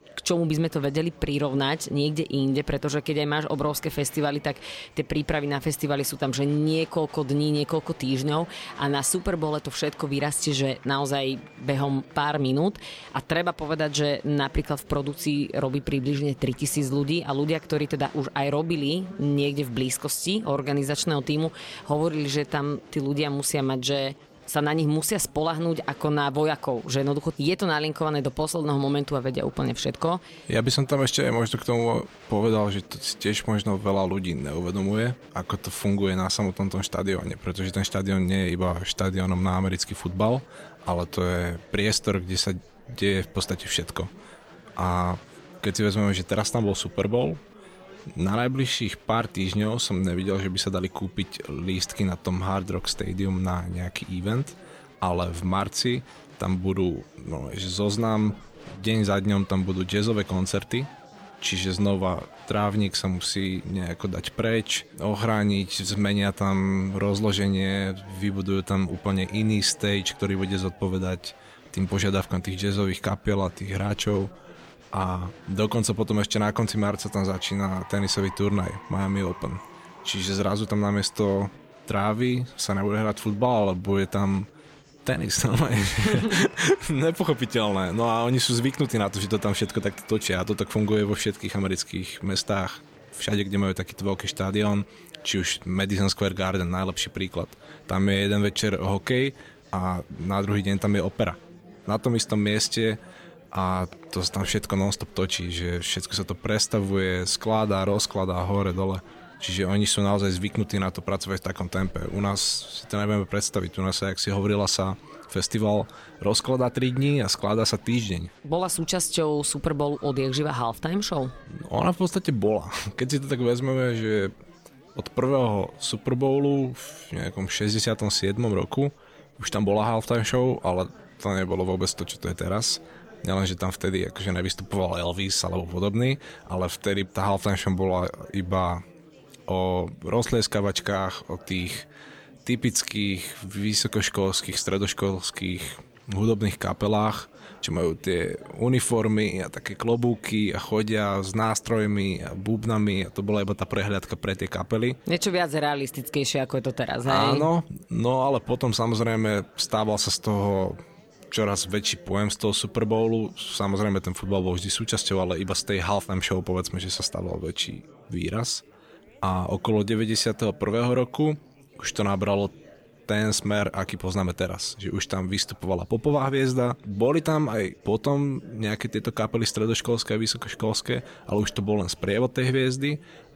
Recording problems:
chatter from many people; faint; throughout; 25 dB below the speech

